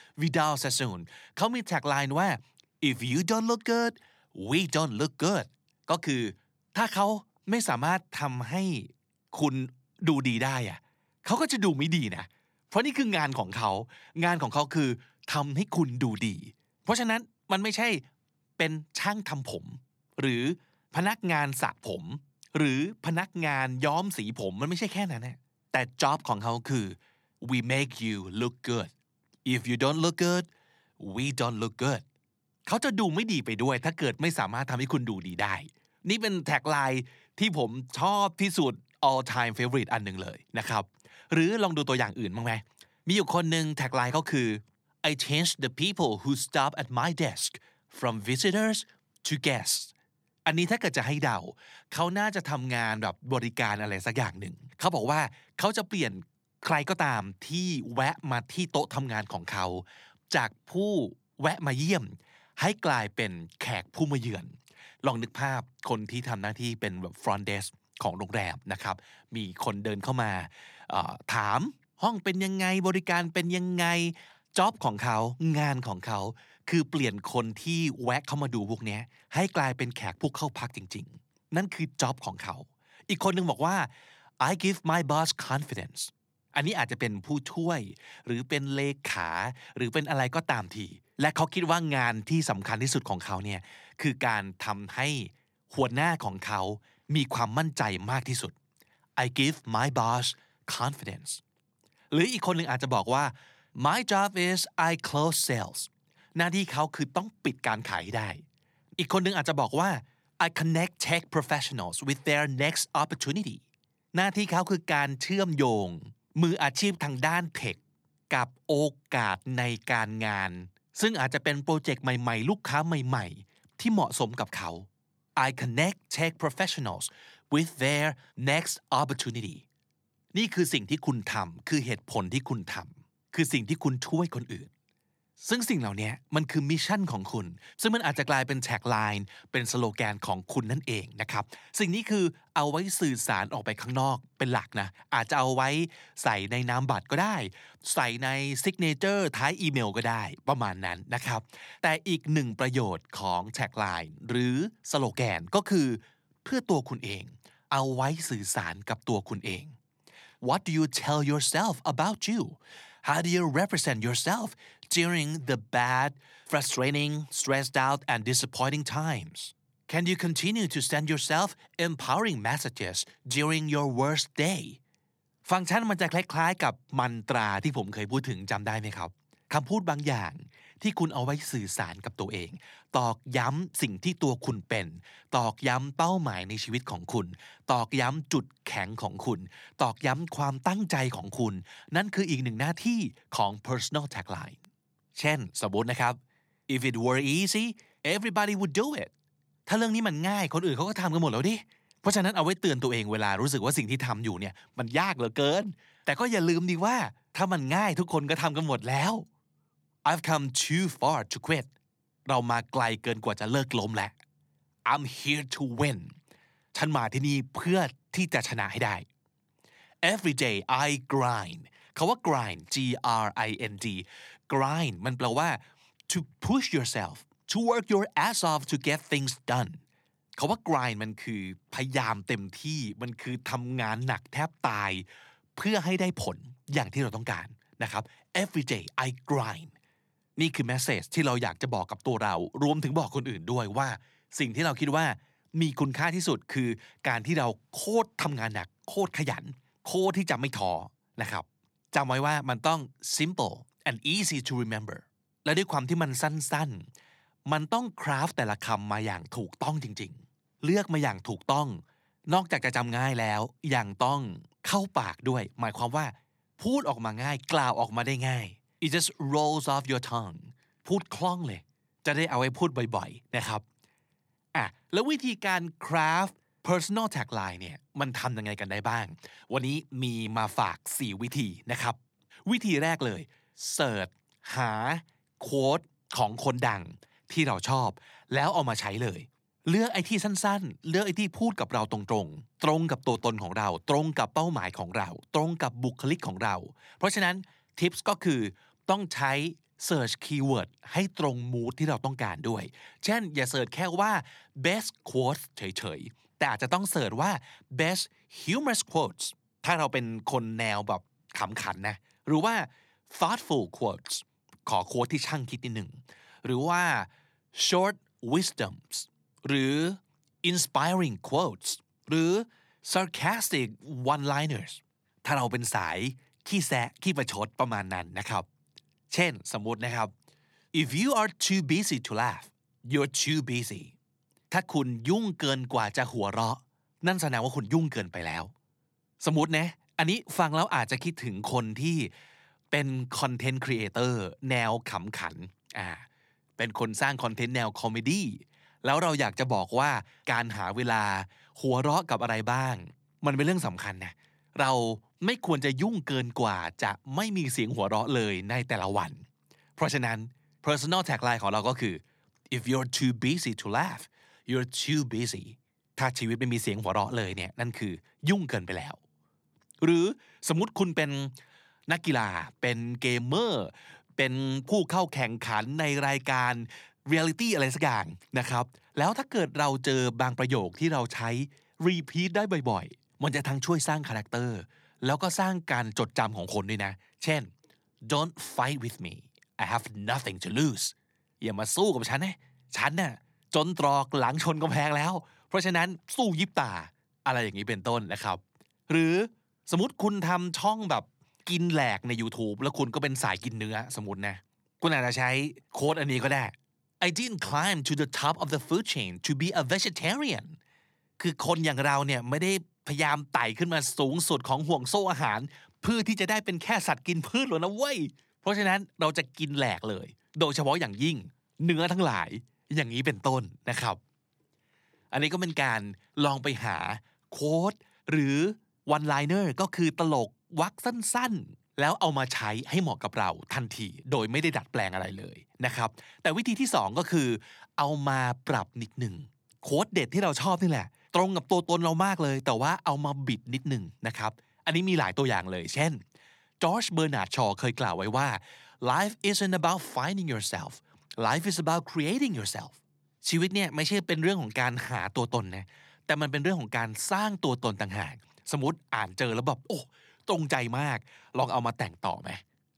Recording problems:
none

